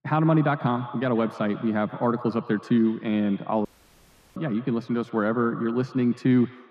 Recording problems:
muffled; very; fading above 2.5 kHz
echo of what is said; noticeable; throughout; 130 ms later, 20 dB below the speech
audio cutting out; at 3.5 s for 0.5 s

